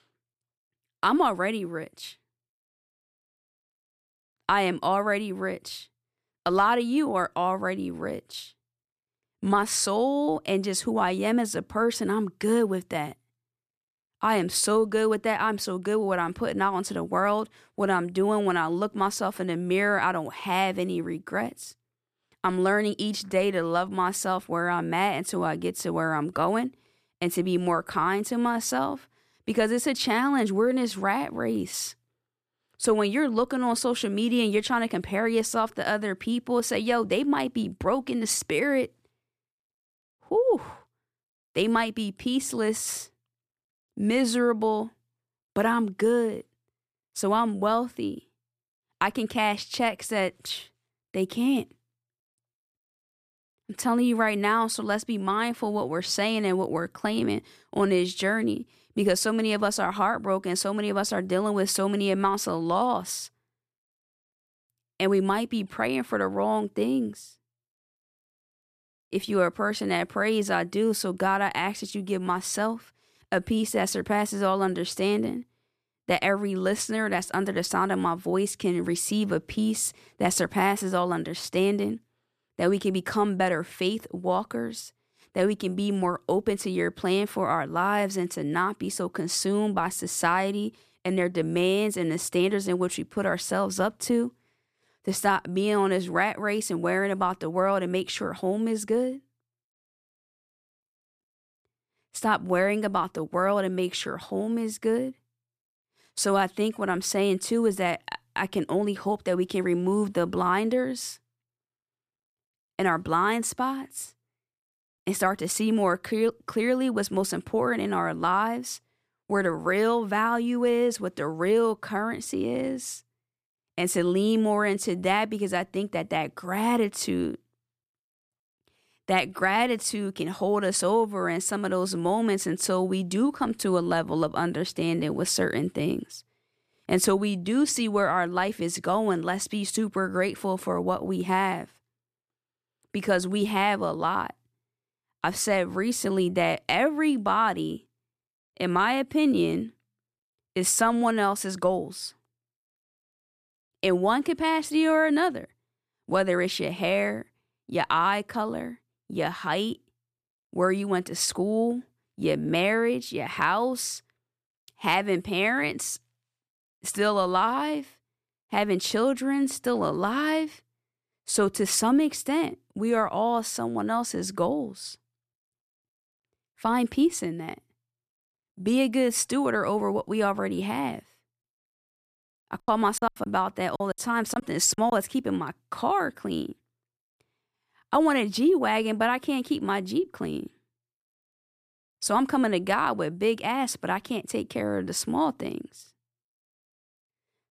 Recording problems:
choppy; very; from 3:03 to 3:05; 18% of the speech affected

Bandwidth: 14.5 kHz